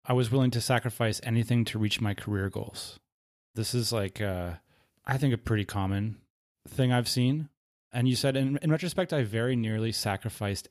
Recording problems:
none

